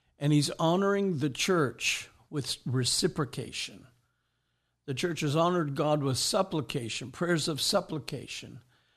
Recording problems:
none

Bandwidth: 13.5 kHz